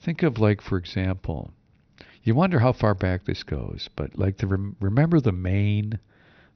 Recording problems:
high frequencies cut off; noticeable; nothing above 6 kHz

